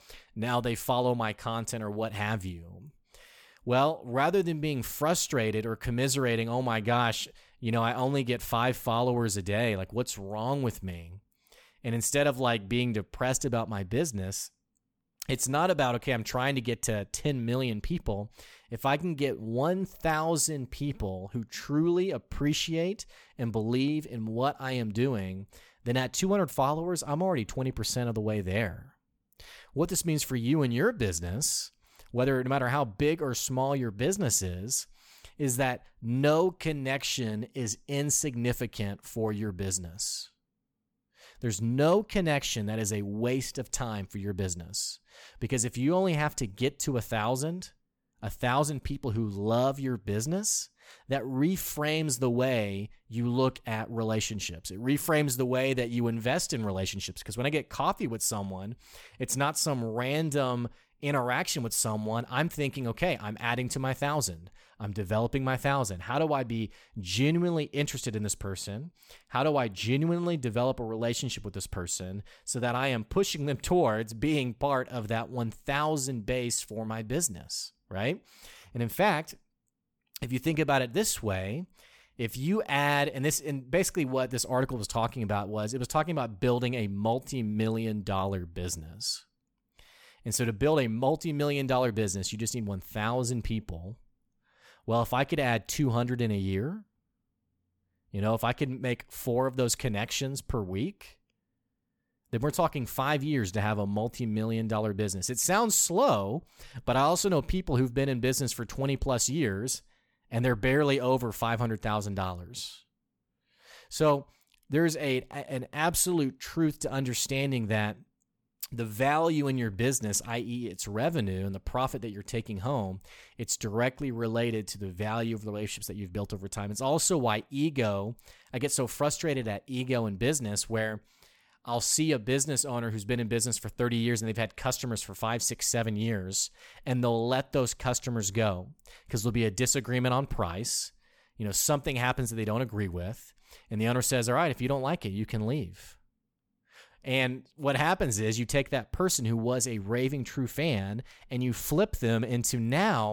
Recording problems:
abrupt cut into speech; at the end

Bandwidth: 18.5 kHz